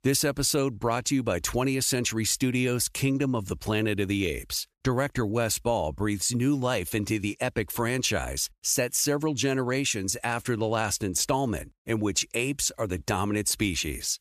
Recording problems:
none

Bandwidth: 14.5 kHz